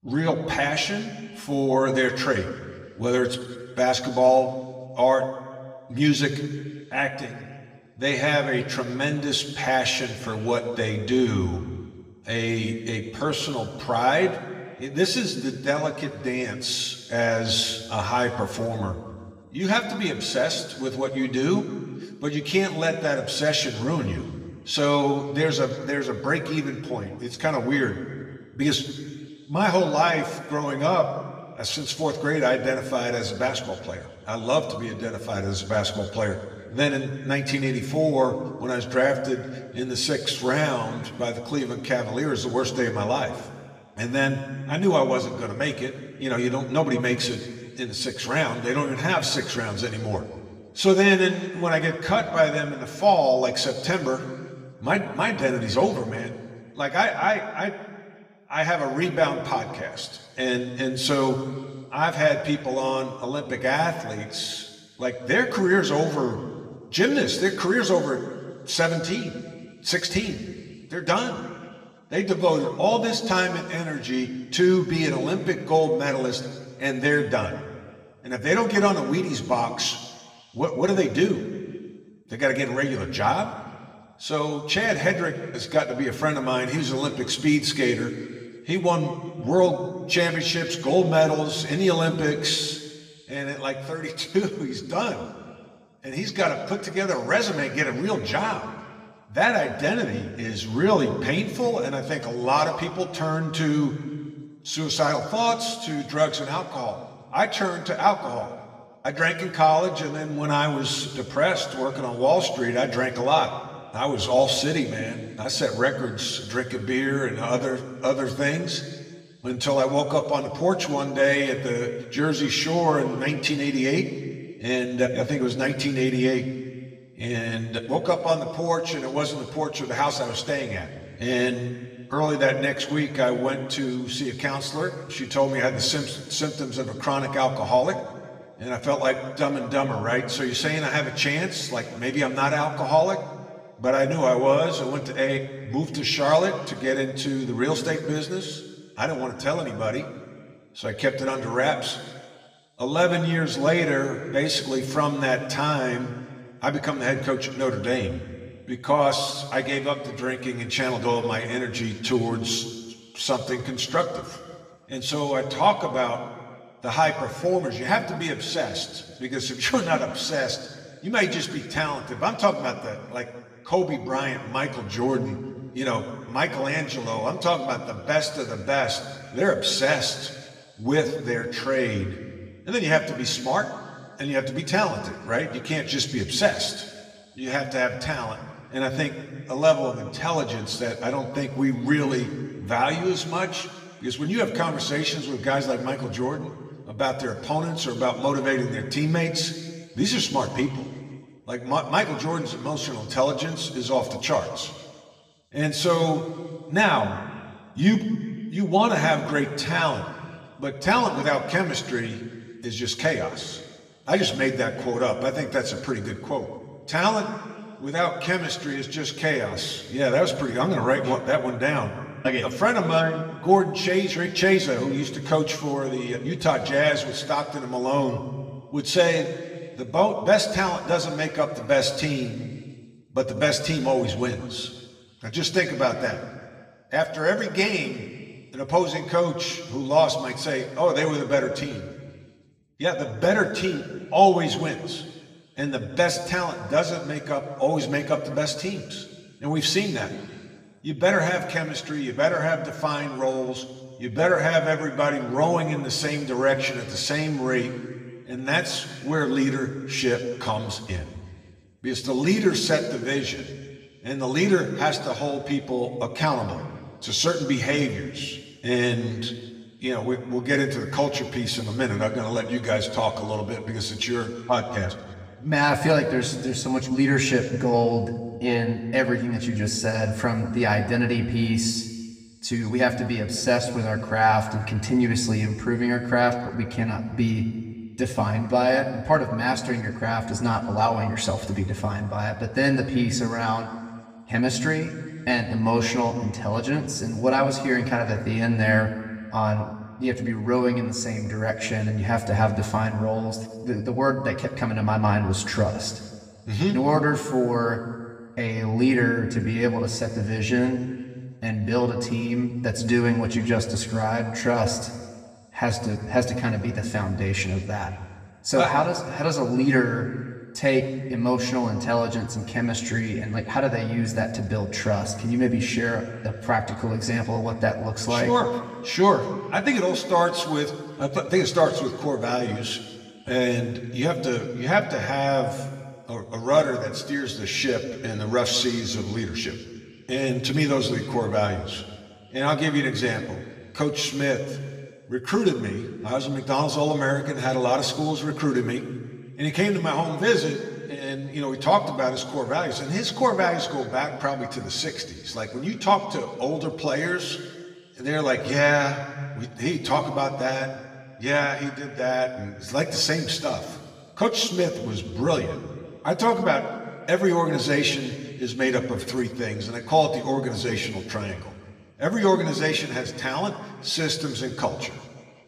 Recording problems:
room echo; slight; dies away in 1.5 s
off-mic speech; somewhat distant

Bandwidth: 15.5 kHz